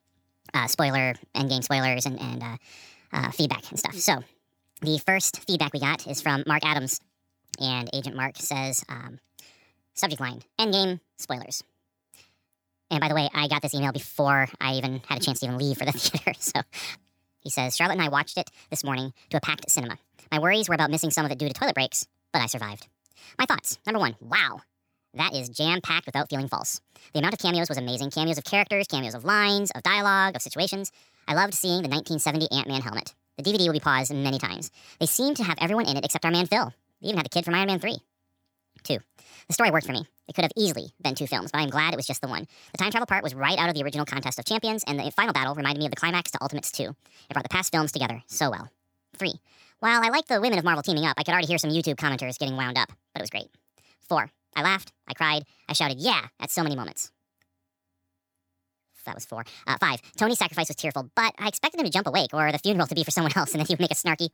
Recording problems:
wrong speed and pitch; too fast and too high; 1.5 times normal speed

